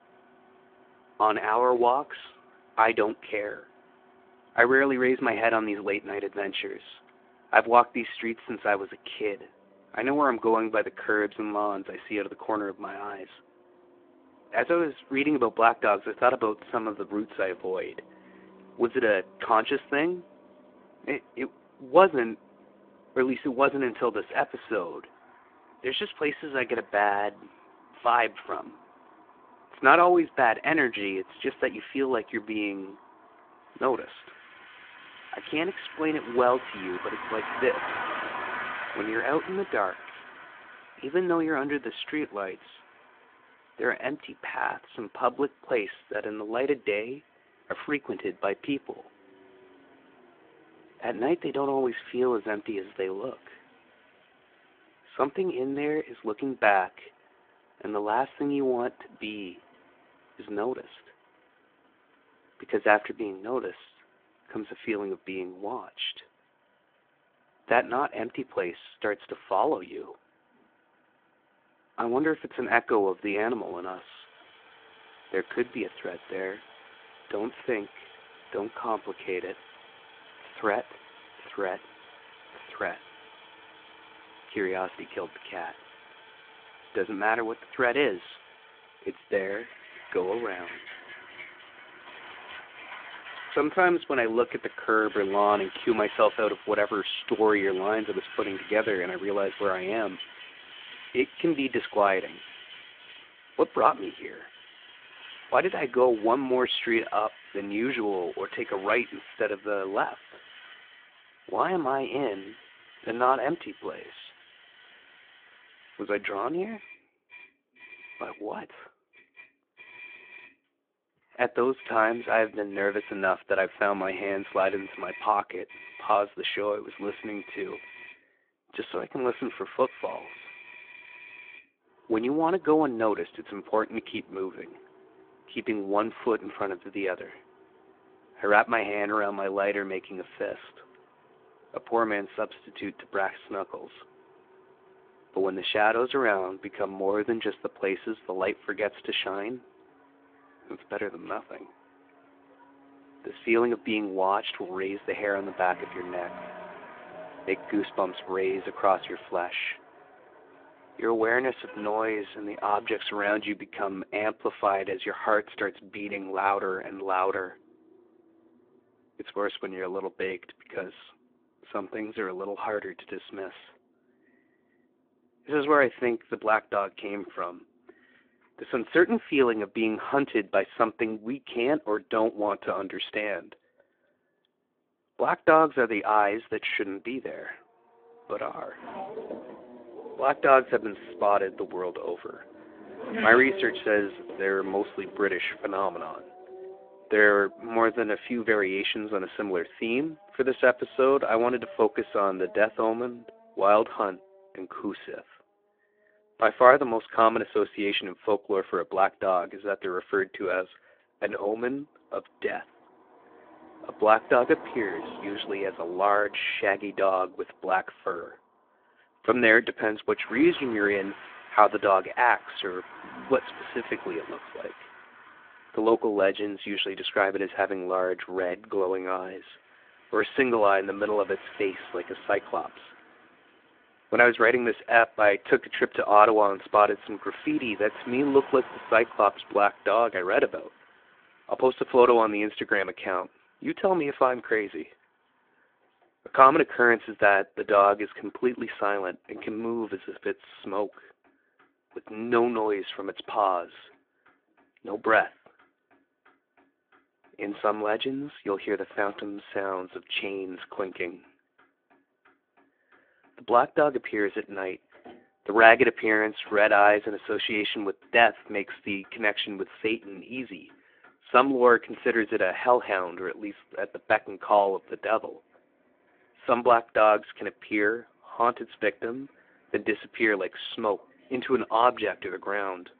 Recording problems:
phone-call audio; nothing above 3.5 kHz
traffic noise; noticeable; throughout; 20 dB below the speech

